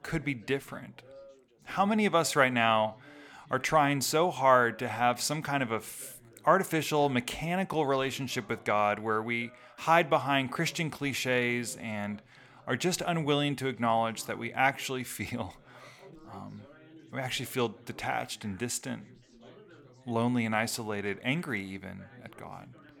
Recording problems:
background chatter; faint; throughout; 3 voices, 25 dB below the speech

